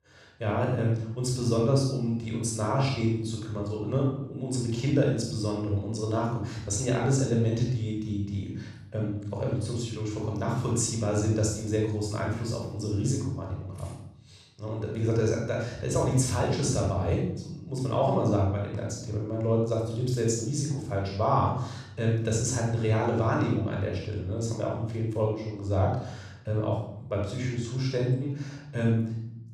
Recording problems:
off-mic speech; far
room echo; noticeable; dies away in 0.7 s

